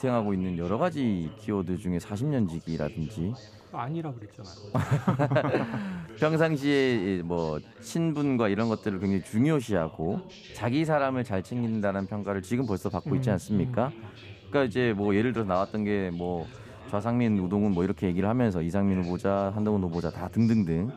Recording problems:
background chatter; noticeable; throughout; 2 voices, 20 dB below the speech

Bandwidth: 15 kHz